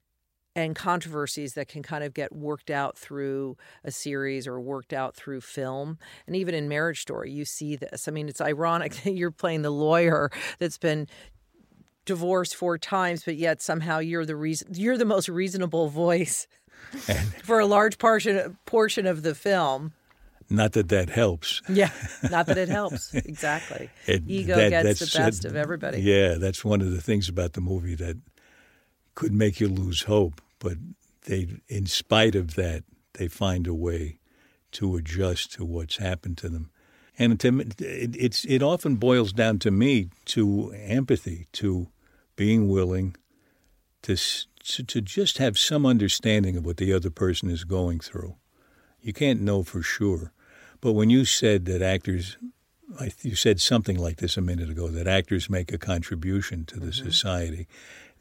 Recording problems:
none

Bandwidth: 16 kHz